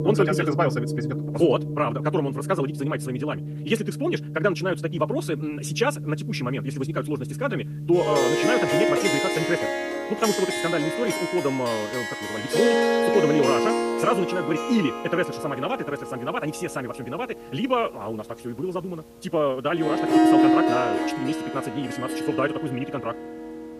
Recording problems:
wrong speed, natural pitch; too fast; 1.8 times normal speed
background music; very loud; throughout; as loud as the speech

